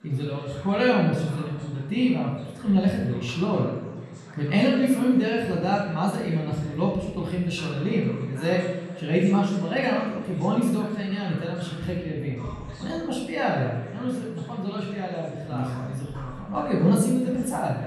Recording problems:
off-mic speech; far
room echo; noticeable; dies away in 1 s
chatter from many people; faint; throughout; 20 dB below the speech

